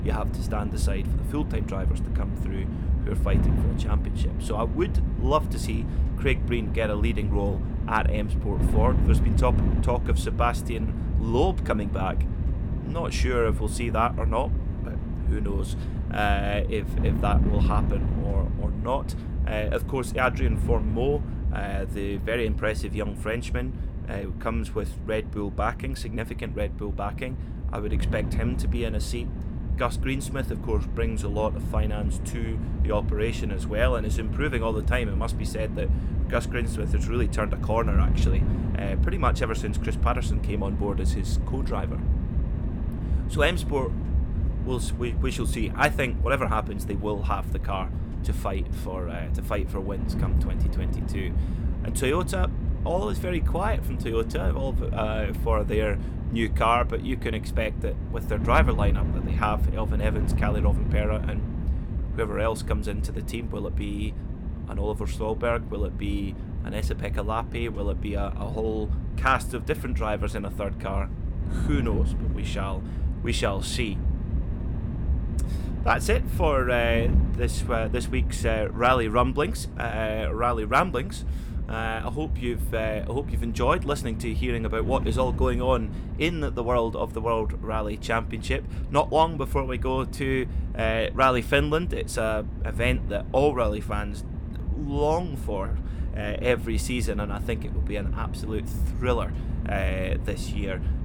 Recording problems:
wind noise on the microphone; occasional gusts; 15 dB below the speech

